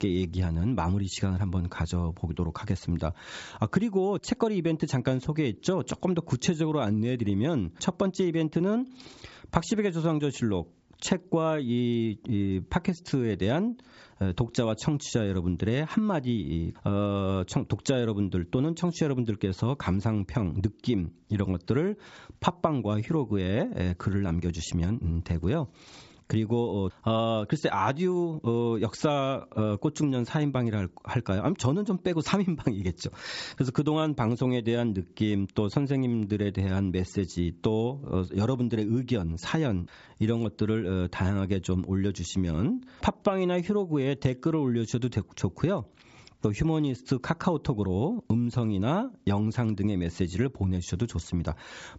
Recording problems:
high frequencies cut off; noticeable; nothing above 8 kHz
squashed, flat; somewhat

